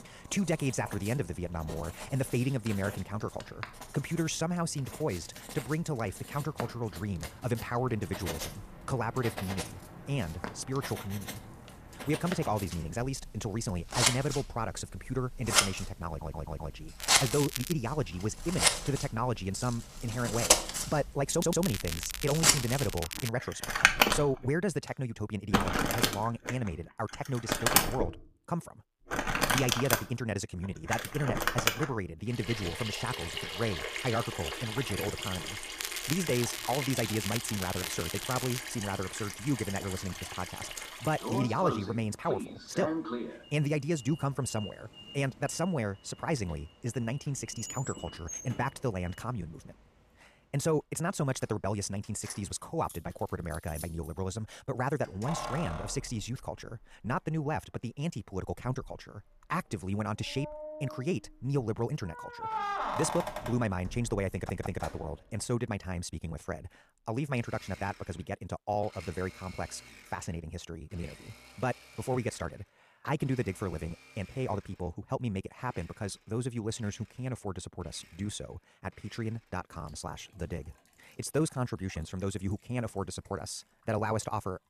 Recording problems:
wrong speed, natural pitch; too fast; 1.5 times normal speed
household noises; very loud; throughout; 2 dB above the speech
crackling; loud; at 17 s, from 21 to 23 s and from 36 to 39 s; 3 dB below the speech
audio stuttering; at 16 s, at 21 s and at 1:04

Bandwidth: 14.5 kHz